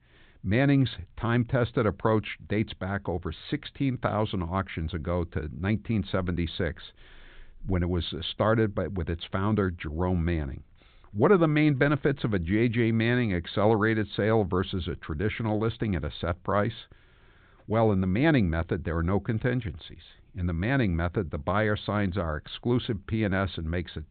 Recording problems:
high frequencies cut off; severe; nothing above 4 kHz

